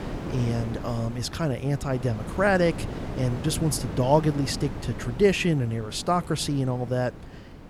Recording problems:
wind noise on the microphone; occasional gusts; 15 dB below the speech

